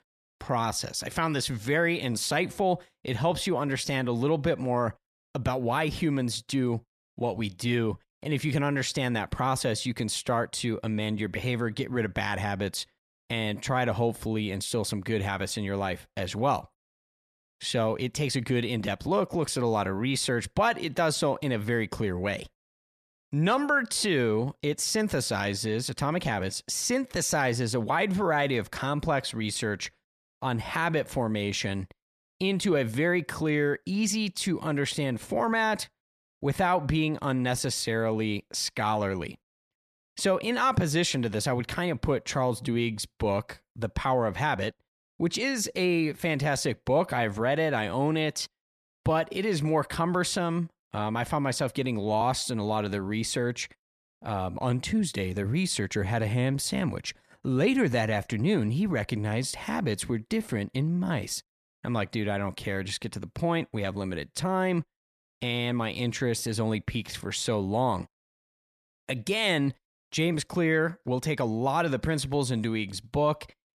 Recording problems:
none

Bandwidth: 14 kHz